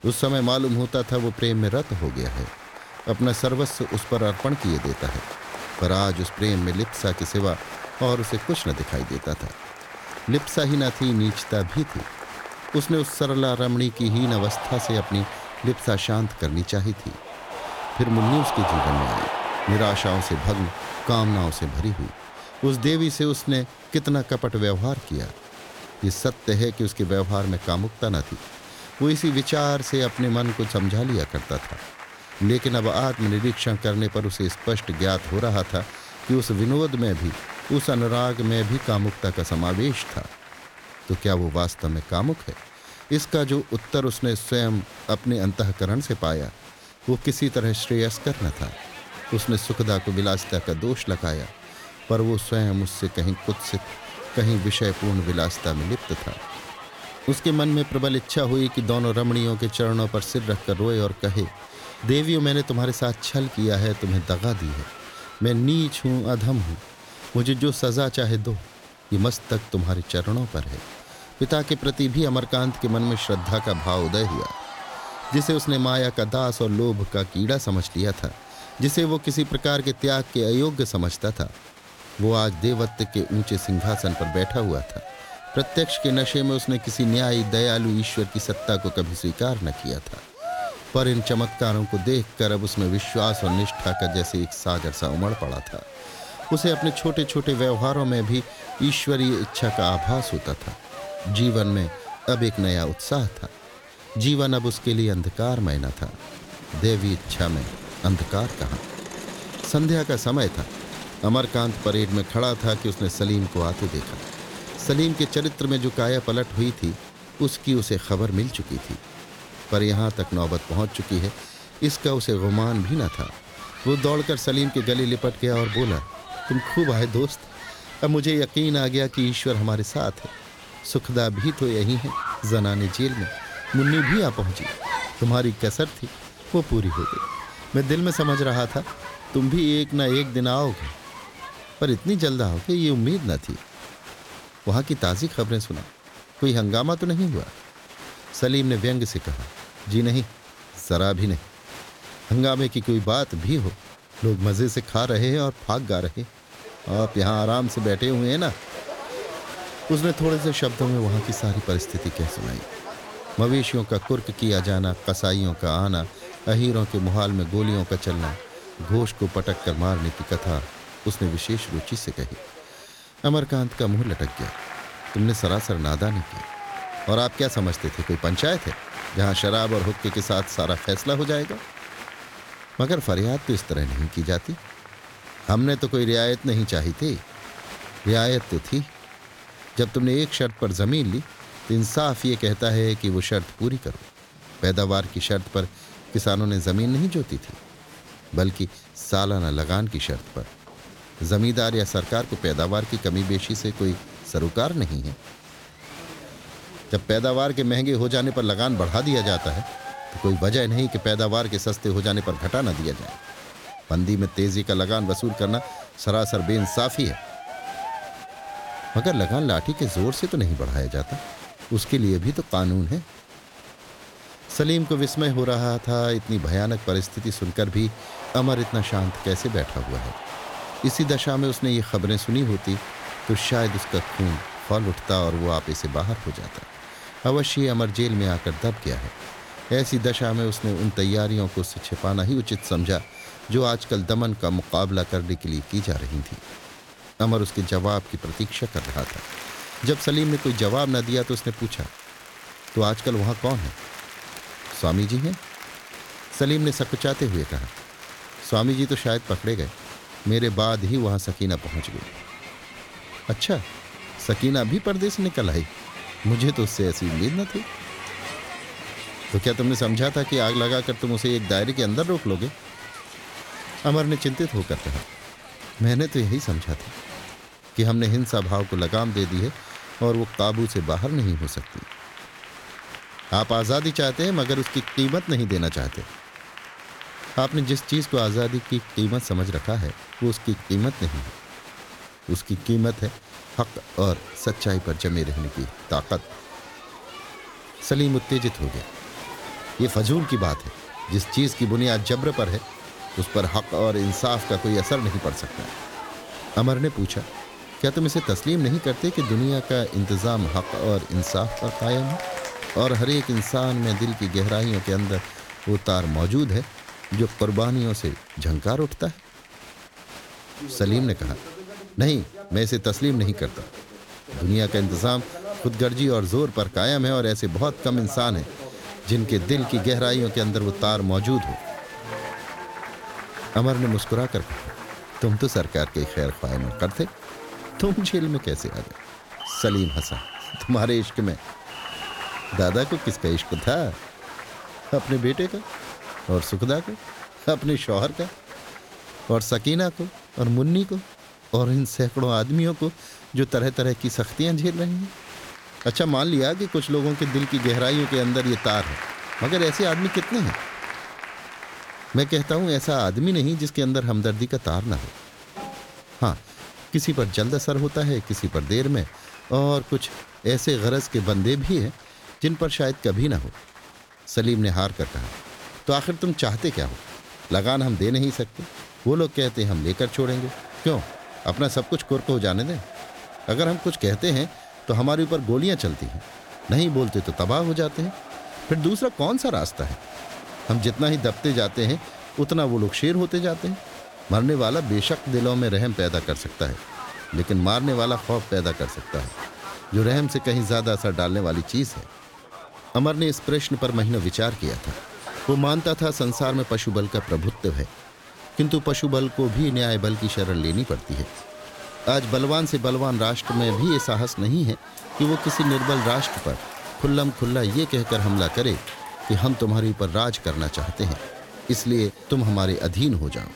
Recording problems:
crowd noise; noticeable; throughout; 15 dB below the speech

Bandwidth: 17 kHz